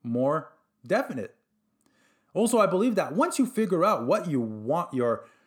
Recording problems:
none

